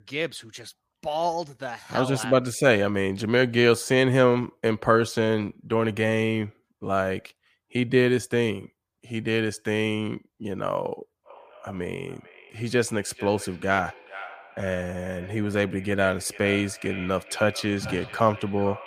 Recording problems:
echo of what is said; noticeable; from 11 s on; 440 ms later, 15 dB below the speech

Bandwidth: 15 kHz